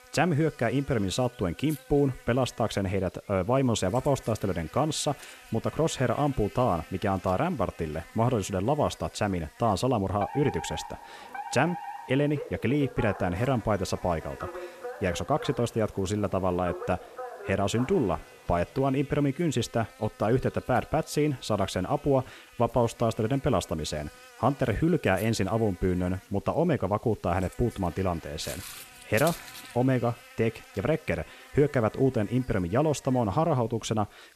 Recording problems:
electrical hum; faint; throughout; 60 Hz, 20 dB below the speech
alarm; noticeable; from 10 to 19 s; peak 8 dB below the speech
footsteps; noticeable; from 28 to 30 s; peak 9 dB below the speech

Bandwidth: 14 kHz